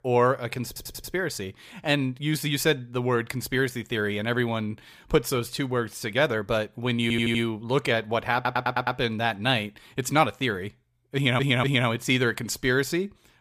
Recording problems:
audio stuttering; 4 times, first at 0.5 s

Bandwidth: 15 kHz